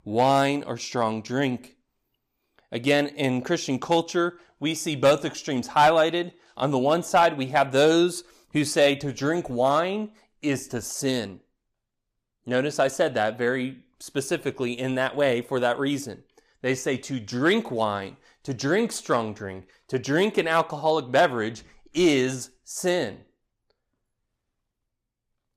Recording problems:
none

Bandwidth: 15 kHz